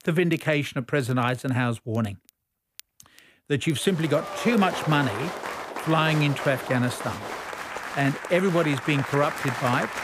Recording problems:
crowd noise; loud; from 4 s on; 8 dB below the speech
crackle, like an old record; faint; 30 dB below the speech

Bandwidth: 15 kHz